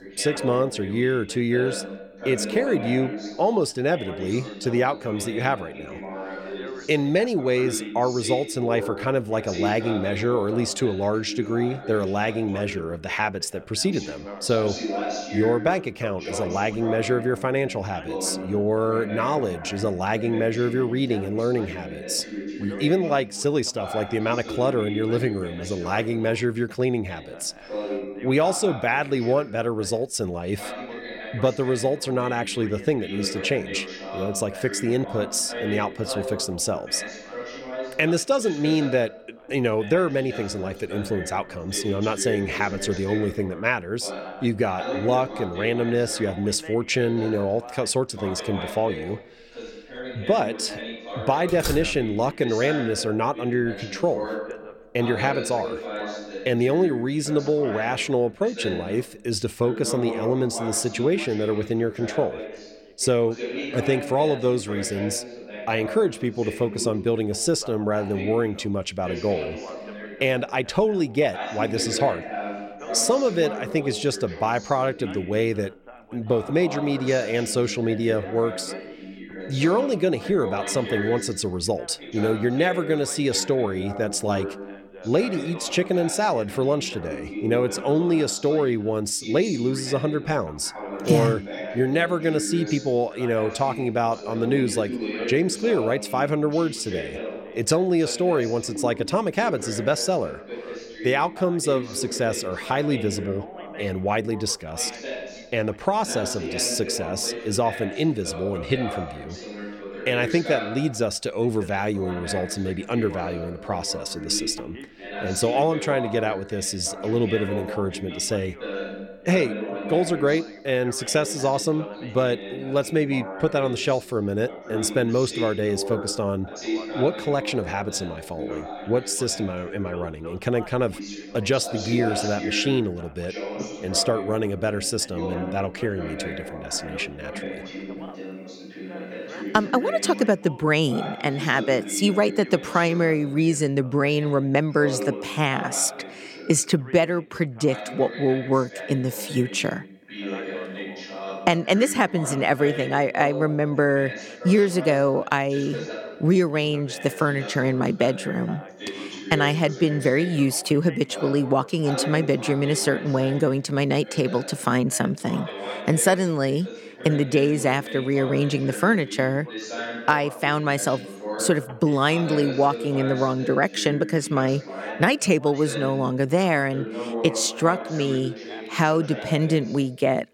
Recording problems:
background chatter; noticeable; throughout; 2 voices, 10 dB below the speech
door banging; noticeable; at 51 s; peak 6 dB below the speech

